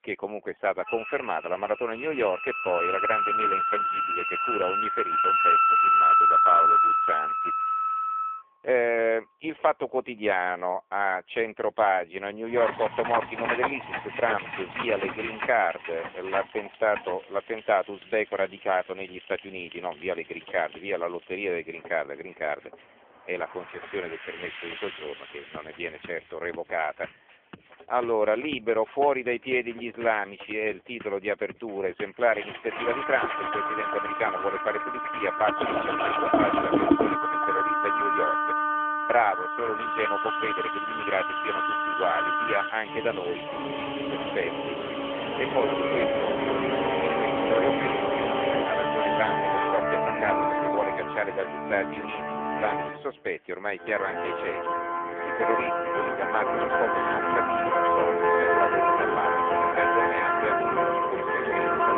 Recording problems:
phone-call audio; poor line; nothing above 3.5 kHz
background music; very loud; throughout; 4 dB above the speech
household noises; loud; from 13 s on; 5 dB below the speech

